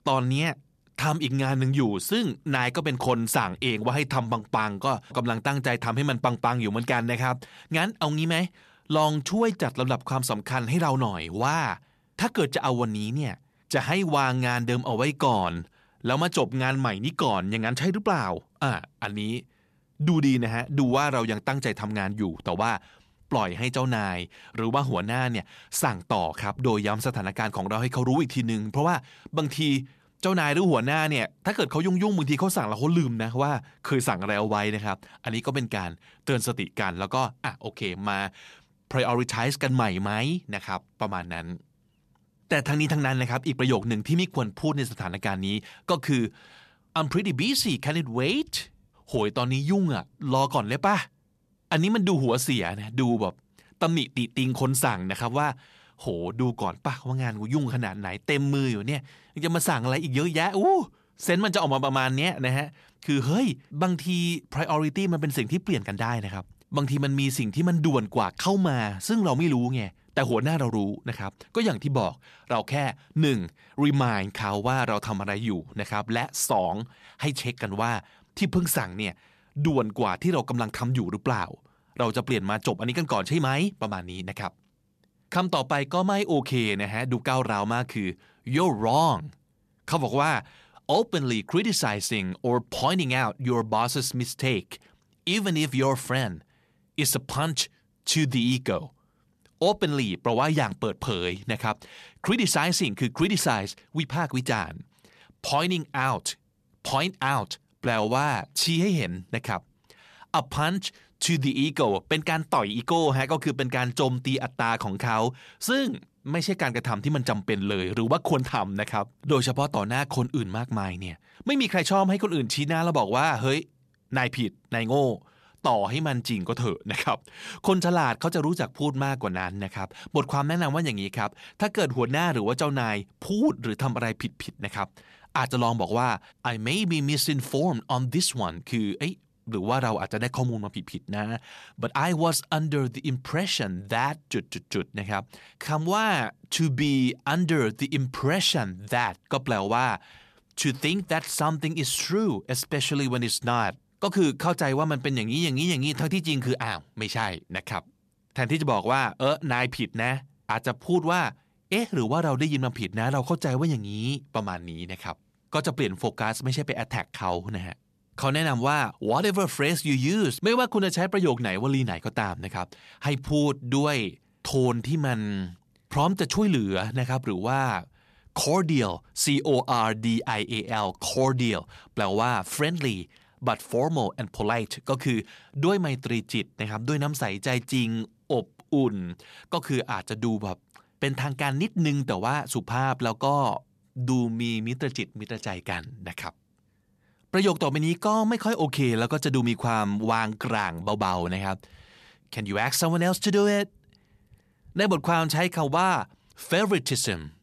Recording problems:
uneven, jittery; strongly; from 42 s to 3:02

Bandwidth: 14 kHz